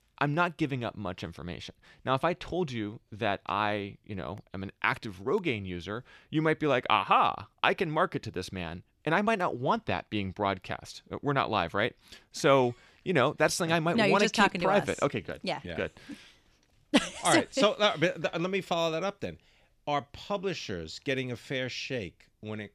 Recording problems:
none

